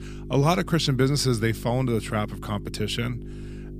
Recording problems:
electrical hum; noticeable; throughout; 50 Hz, 20 dB below the speech

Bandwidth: 15 kHz